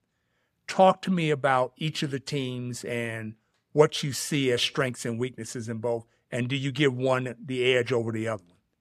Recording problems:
none

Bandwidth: 14.5 kHz